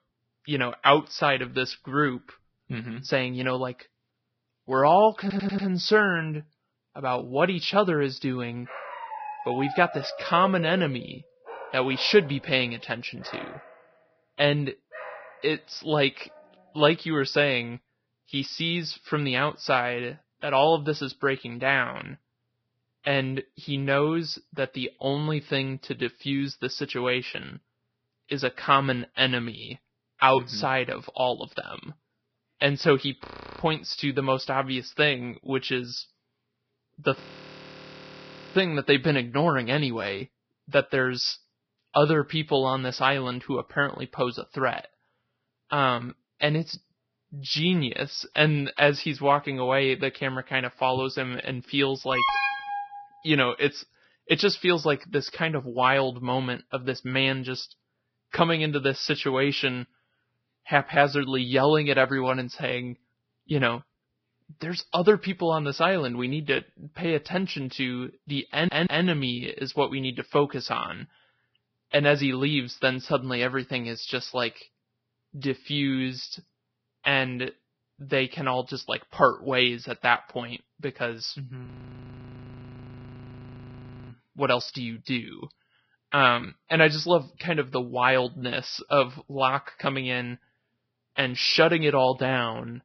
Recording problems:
garbled, watery; badly; nothing above 5.5 kHz
audio stuttering; at 5 s and at 1:09
dog barking; noticeable; from 8.5 to 16 s; peak 9 dB below the speech
audio freezing; at 33 s, at 37 s for 1.5 s and at 1:22 for 2.5 s
alarm; loud; at 52 s; peak 2 dB above the speech

